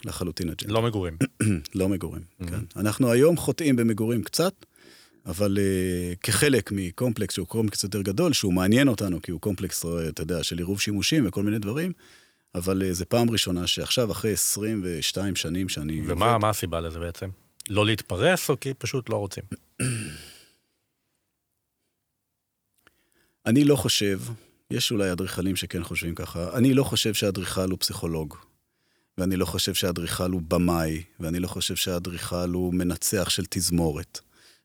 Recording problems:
none

